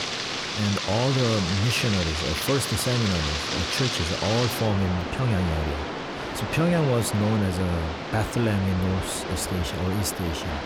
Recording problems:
rain or running water; loud; throughout; 3 dB below the speech

